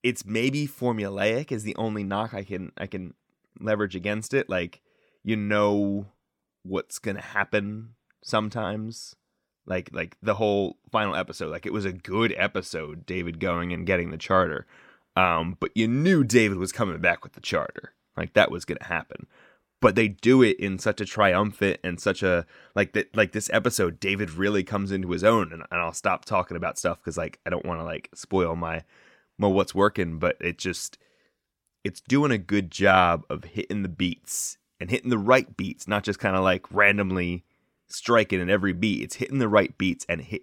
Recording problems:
none

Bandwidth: 17.5 kHz